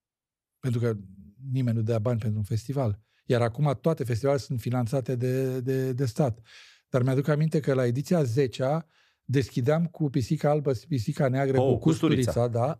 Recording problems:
none

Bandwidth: 14.5 kHz